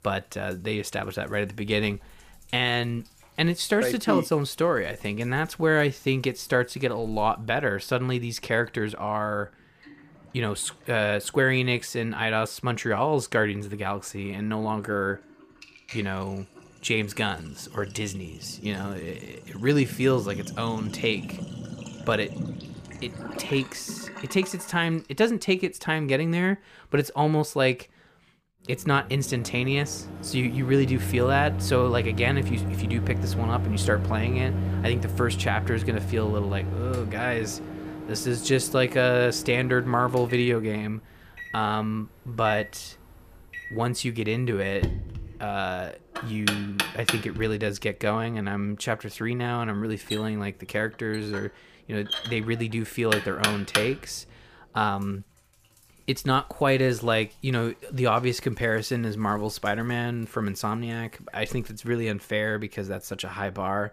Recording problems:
household noises; loud; throughout; 6 dB below the speech

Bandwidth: 15 kHz